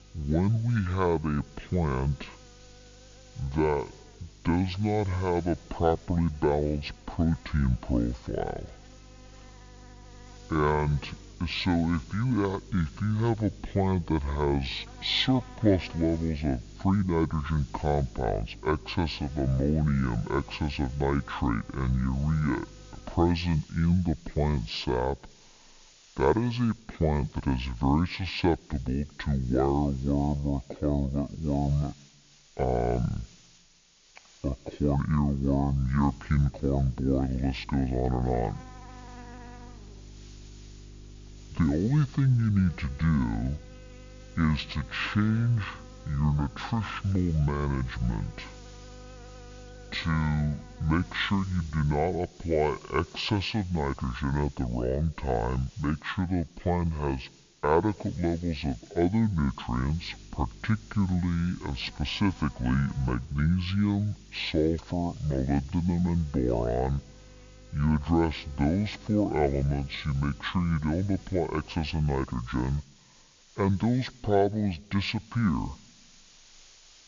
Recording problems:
wrong speed and pitch; too slow and too low; 0.6 times normal speed
high frequencies cut off; noticeable; nothing above 7 kHz
electrical hum; faint; until 23 s, from 36 to 52 s and from 1:00 to 1:12; 50 Hz, 20 dB below the speech
hiss; faint; throughout; 25 dB below the speech

